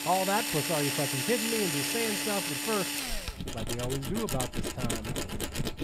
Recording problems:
machinery noise; very loud; throughout; 2 dB above the speech

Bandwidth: 15.5 kHz